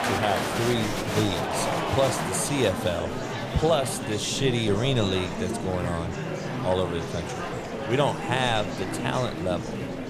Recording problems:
murmuring crowd; loud; throughout; 3 dB below the speech

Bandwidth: 15 kHz